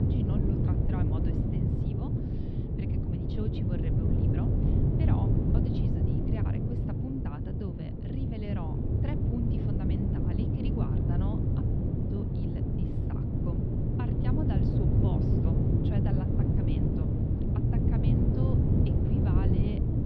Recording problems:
muffled; very slightly; fading above 4 kHz
wind noise on the microphone; heavy; 7 dB above the speech
abrupt cut into speech; at the start

